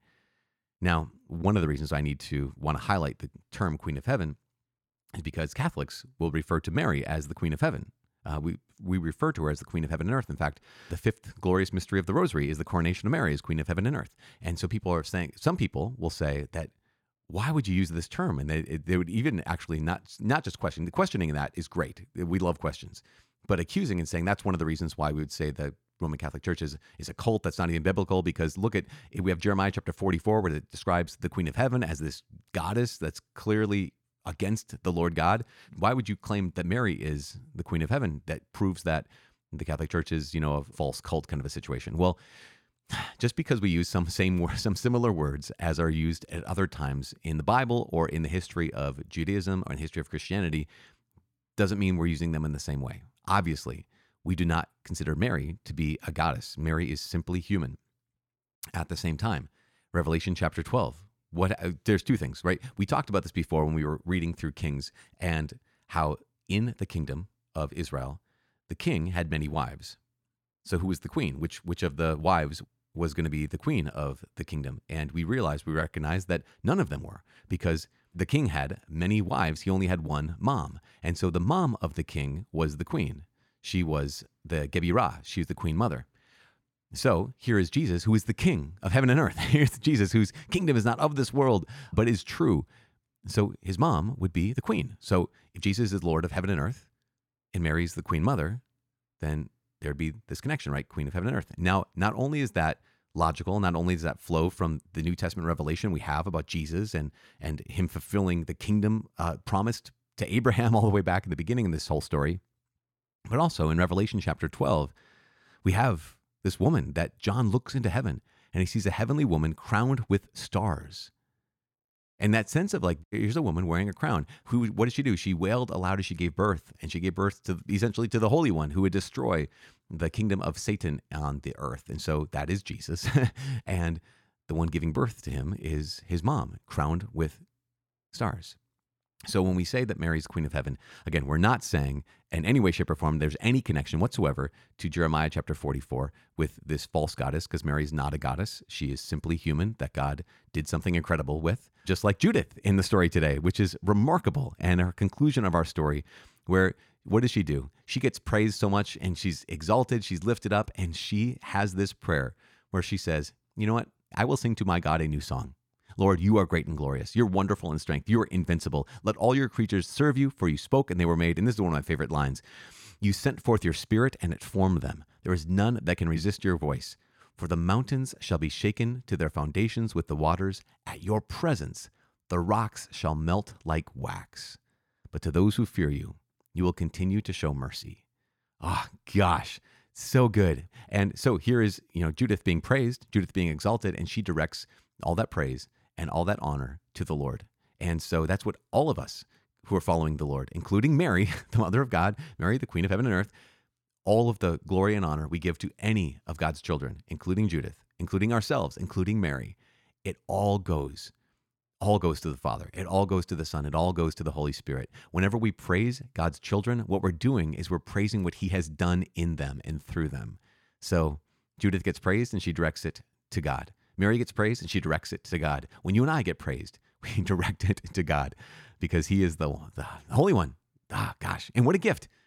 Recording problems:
none

